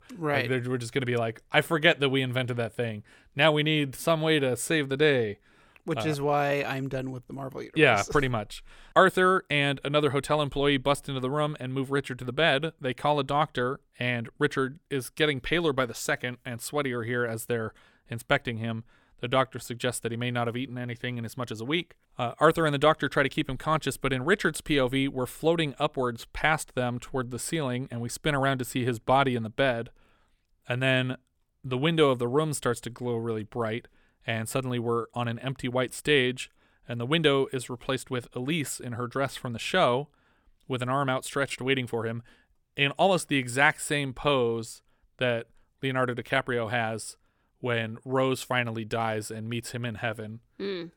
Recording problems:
none

